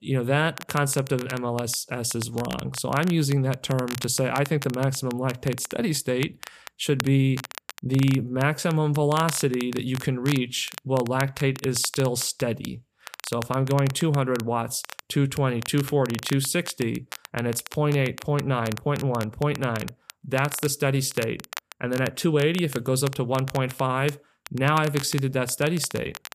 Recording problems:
crackle, like an old record; noticeable; 15 dB below the speech

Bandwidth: 14.5 kHz